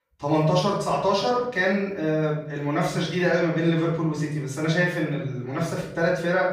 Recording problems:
off-mic speech; far
room echo; noticeable; dies away in 0.7 s

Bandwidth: 15 kHz